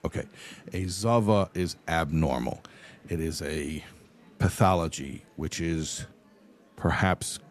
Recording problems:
murmuring crowd; faint; throughout; 30 dB below the speech

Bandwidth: 13.5 kHz